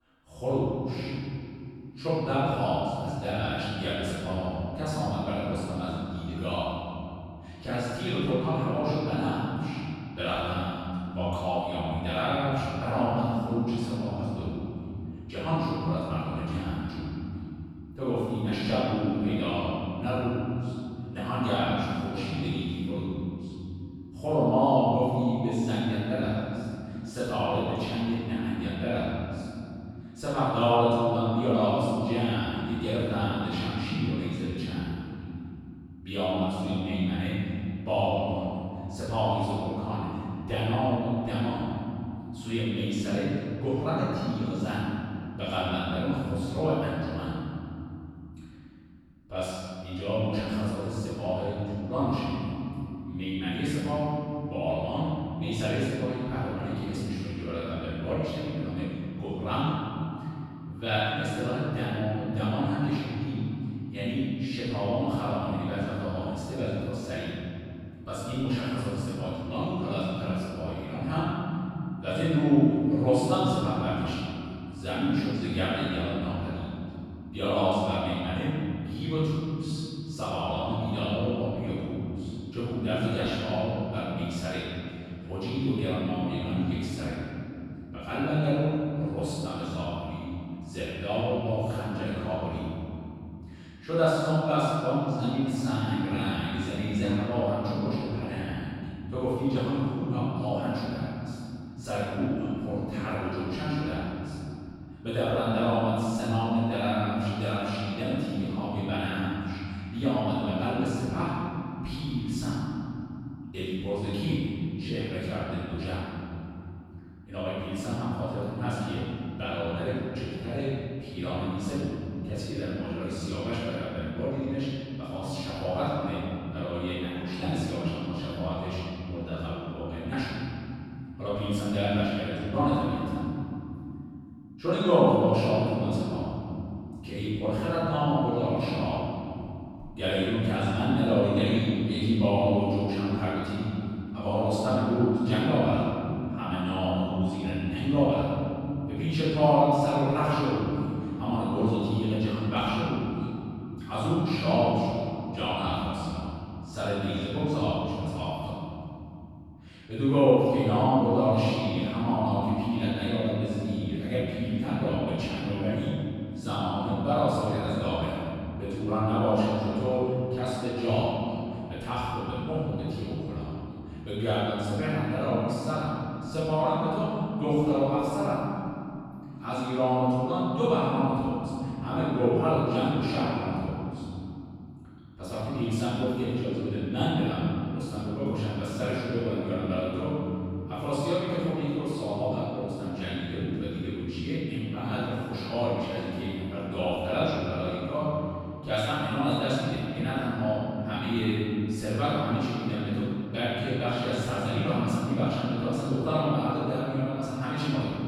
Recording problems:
room echo; strong; dies away in 3 s
off-mic speech; far

